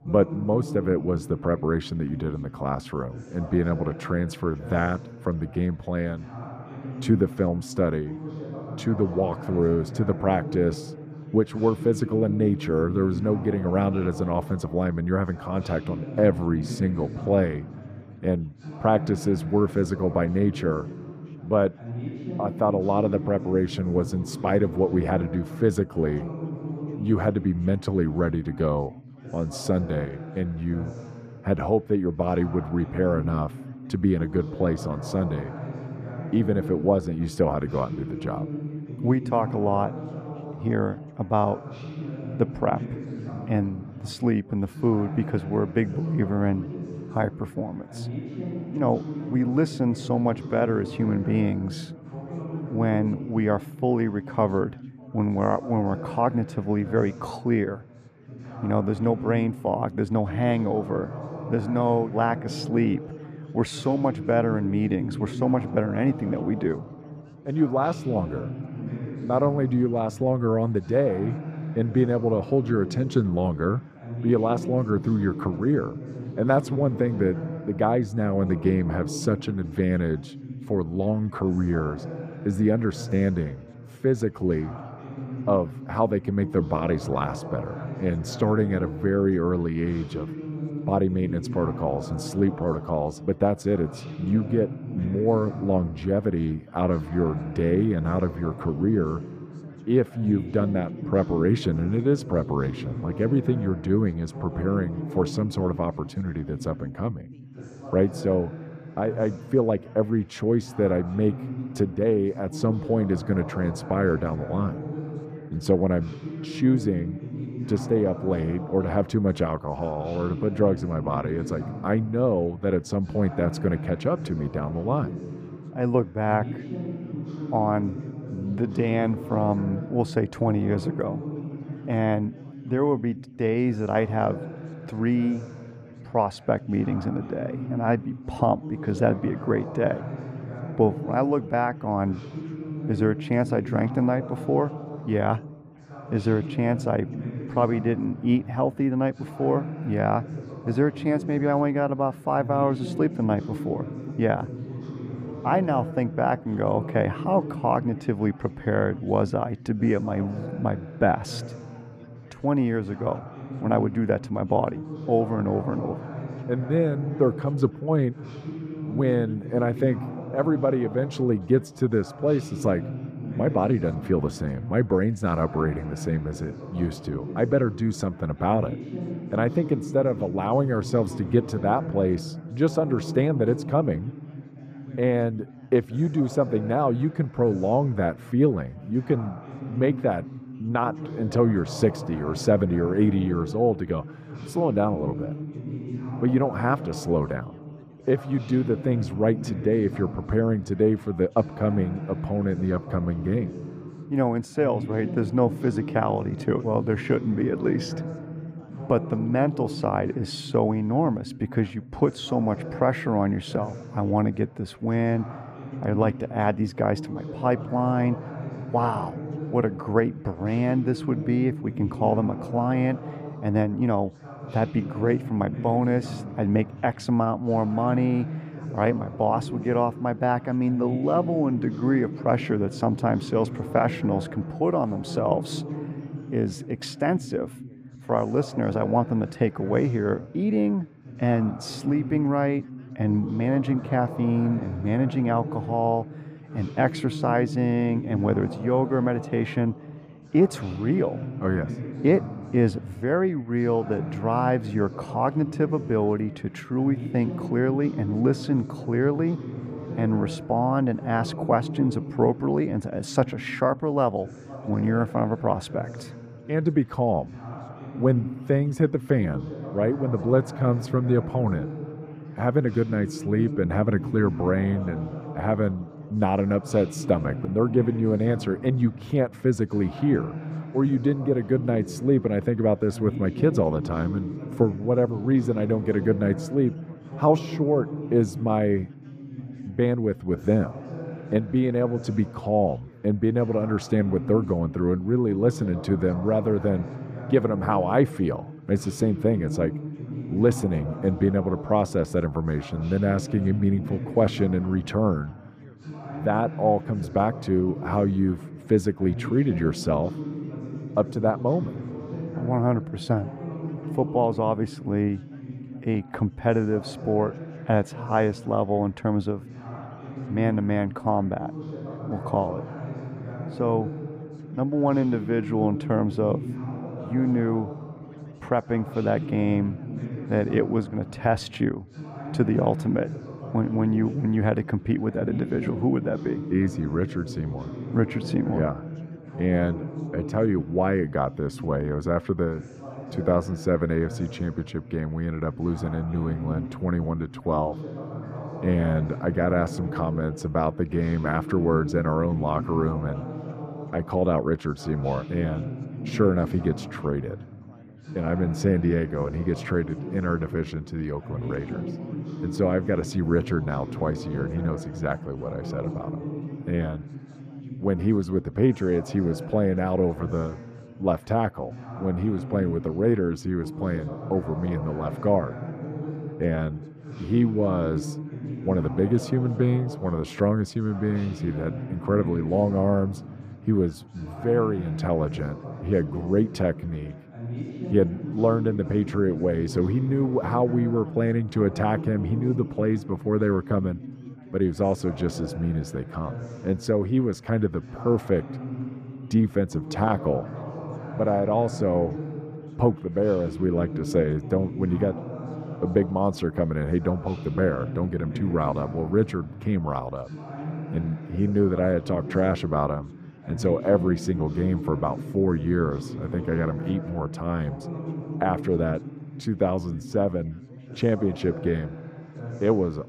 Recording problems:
muffled; slightly; fading above 2 kHz
background chatter; noticeable; throughout; 4 voices, 10 dB below the speech

